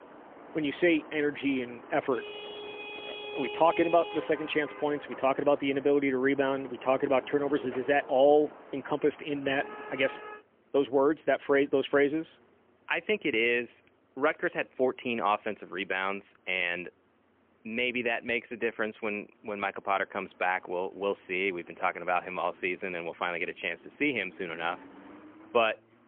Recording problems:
phone-call audio; poor line; nothing above 3 kHz
traffic noise; noticeable; throughout; 15 dB below the speech

